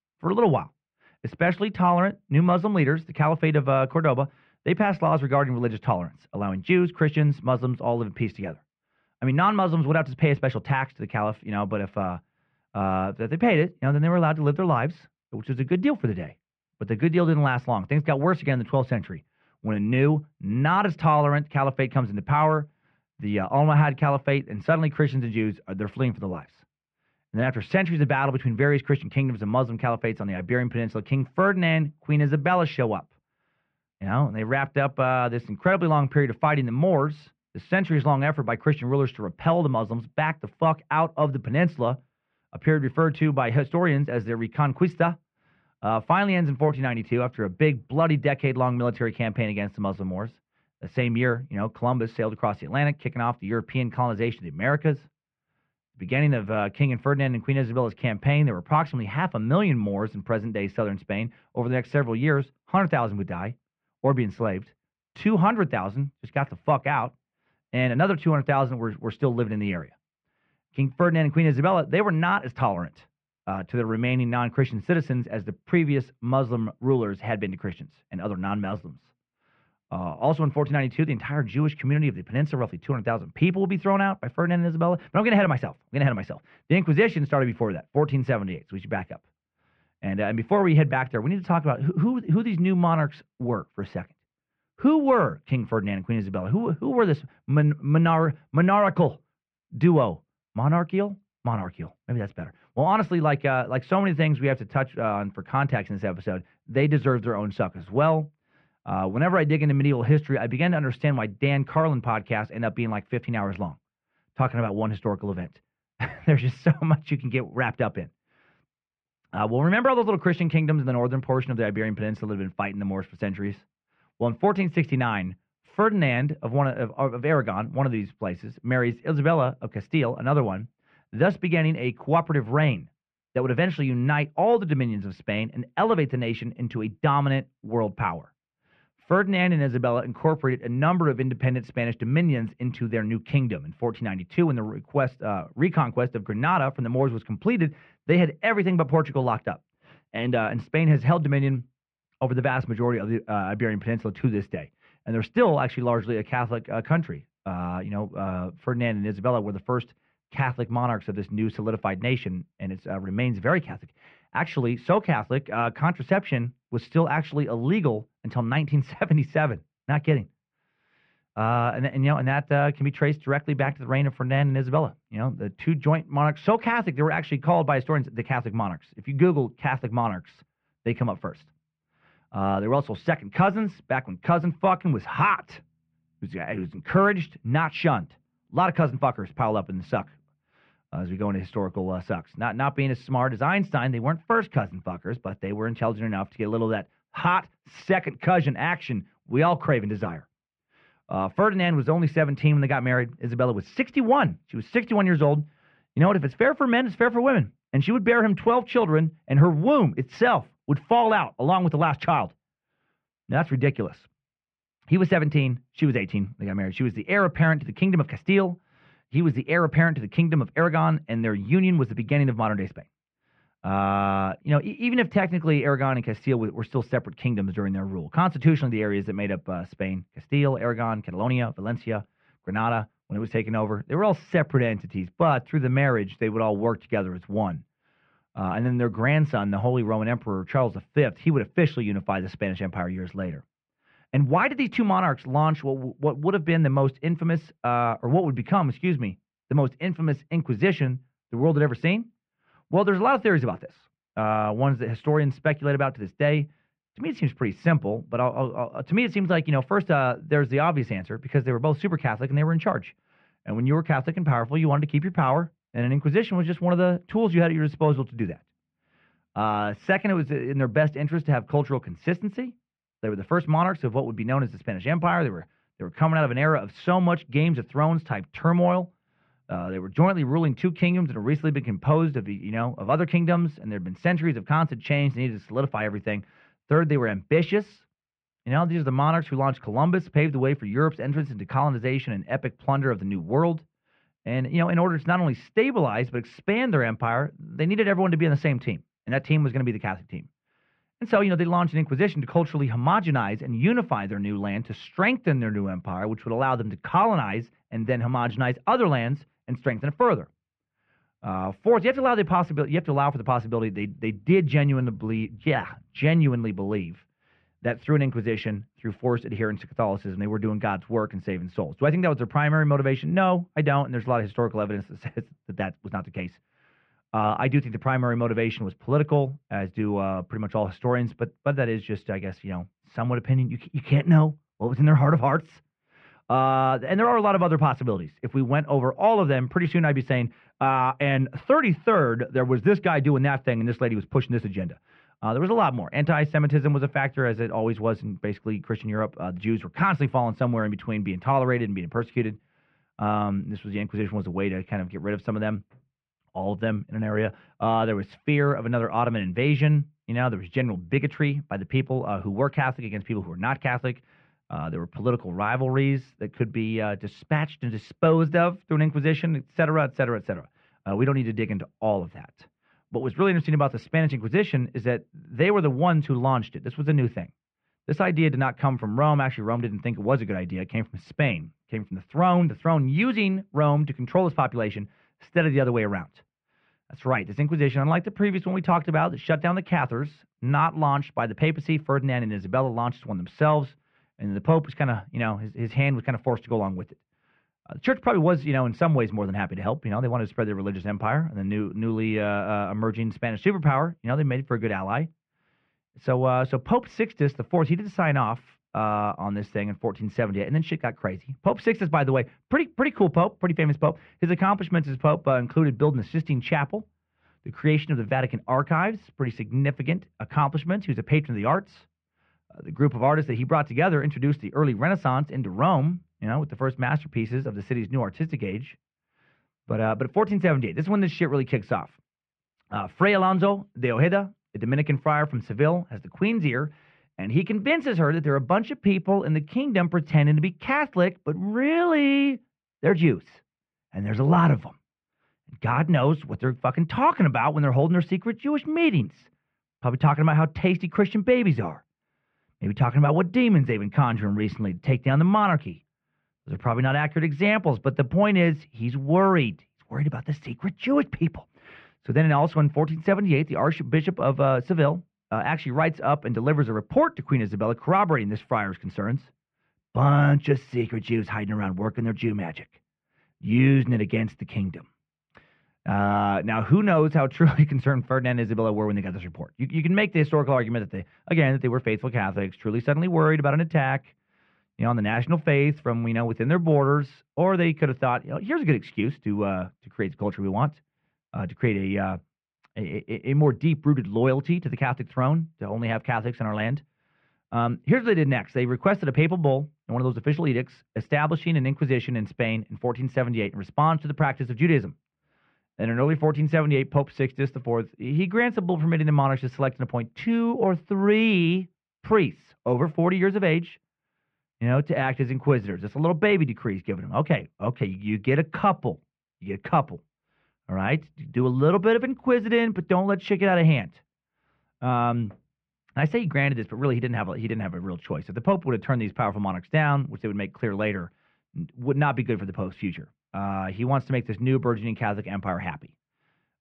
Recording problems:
muffled; very; fading above 2.5 kHz

